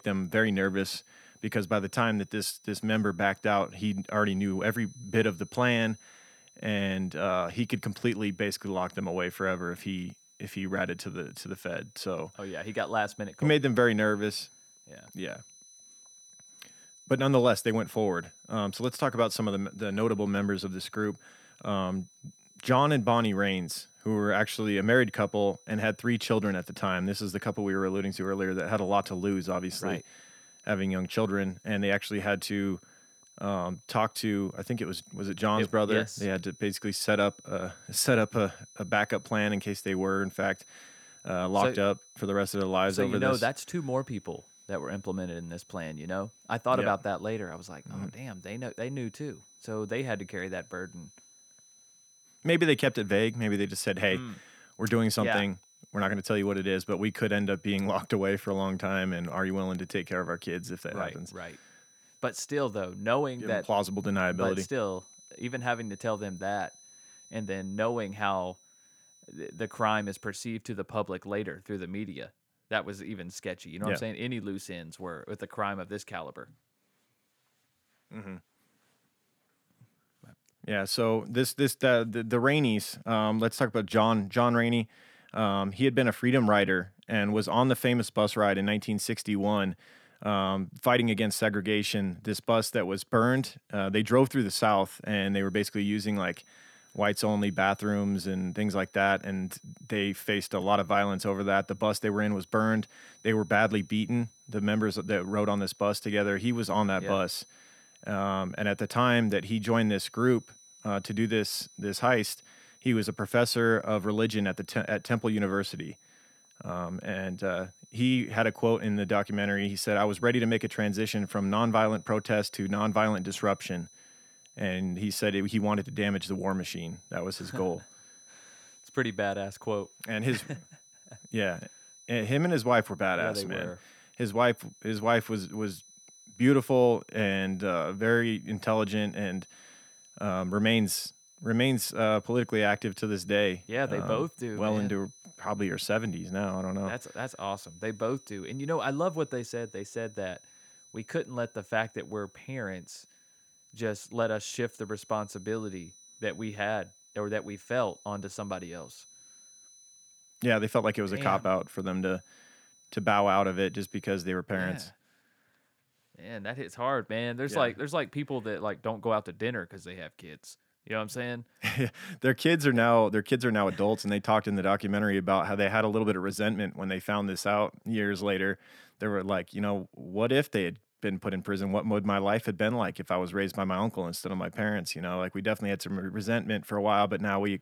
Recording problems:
high-pitched whine; faint; until 1:10 and from 1:35 to 2:44; 6 kHz, 25 dB below the speech

